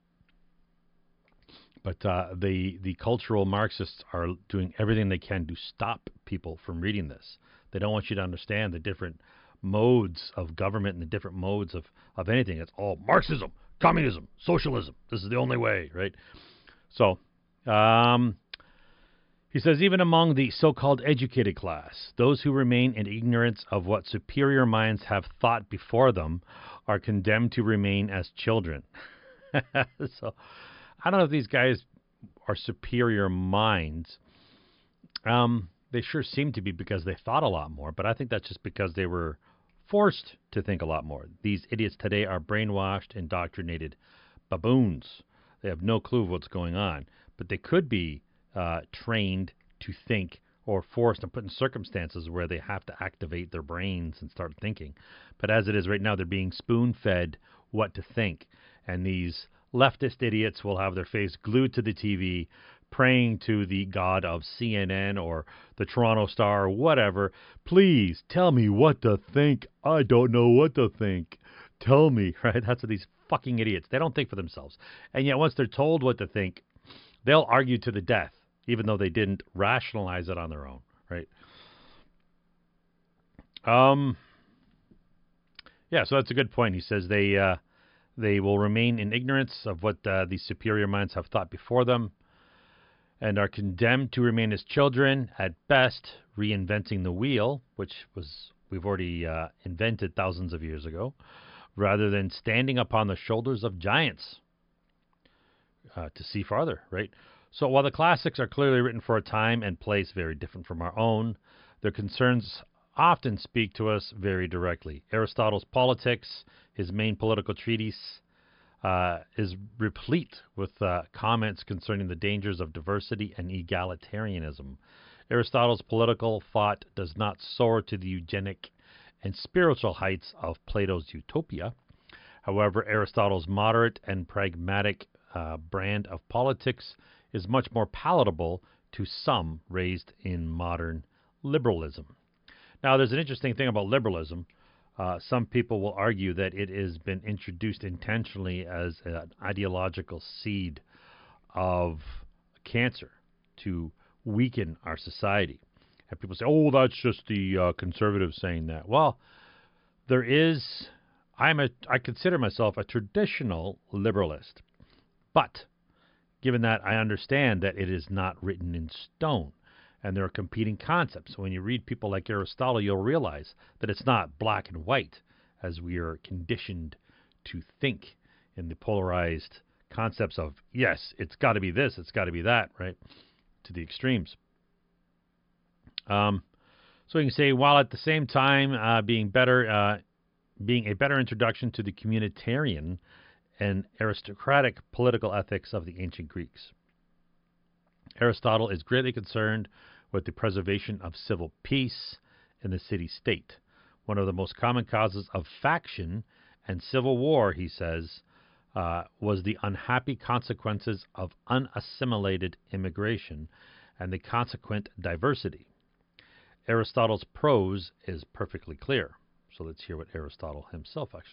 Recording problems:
high frequencies cut off; noticeable; nothing above 5 kHz

